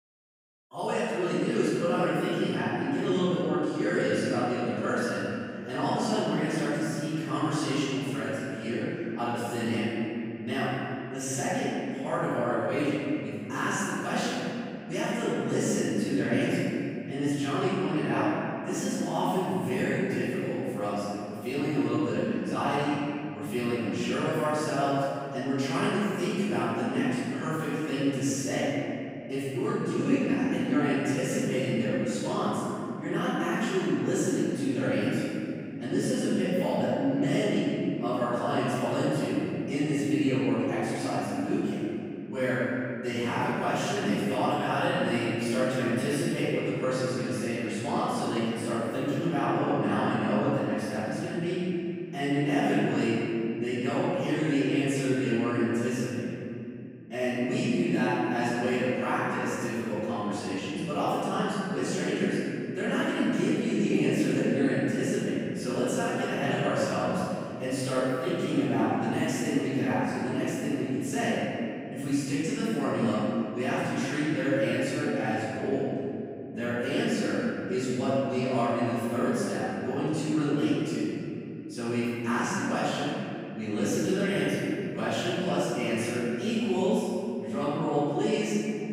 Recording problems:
room echo; strong; dies away in 2.8 s
off-mic speech; far

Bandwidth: 15.5 kHz